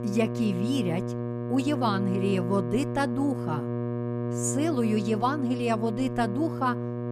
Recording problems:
electrical hum; loud; throughout; 60 Hz, 6 dB below the speech

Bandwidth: 15 kHz